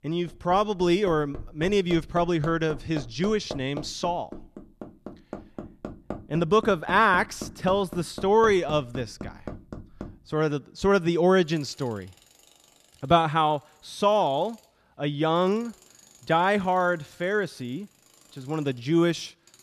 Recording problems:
machinery noise; noticeable; throughout; 15 dB below the speech

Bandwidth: 13.5 kHz